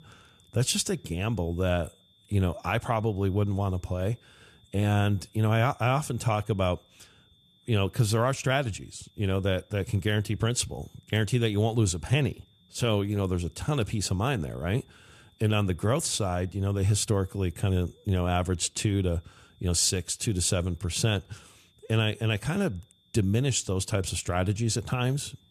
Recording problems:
high-pitched whine; faint; throughout; 3.5 kHz, 35 dB below the speech

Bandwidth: 13.5 kHz